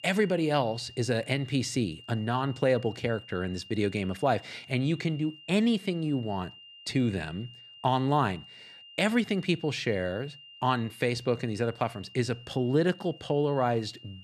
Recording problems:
high-pitched whine; noticeable; throughout; 3 kHz, 20 dB below the speech

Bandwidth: 13.5 kHz